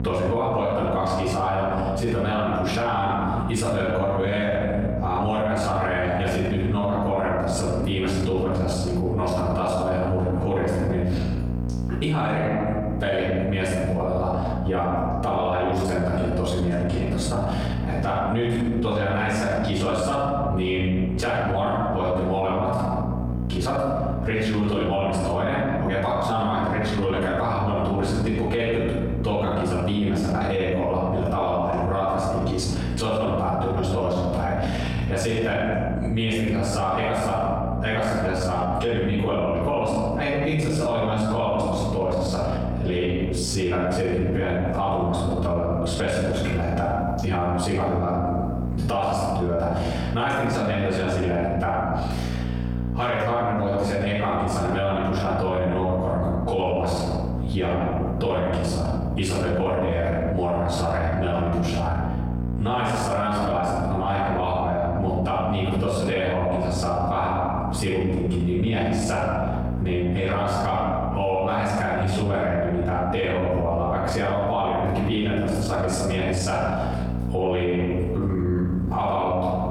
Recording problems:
off-mic speech; far
squashed, flat; heavily
room echo; noticeable; dies away in 1 s
electrical hum; noticeable; throughout; 60 Hz, 15 dB below the speech

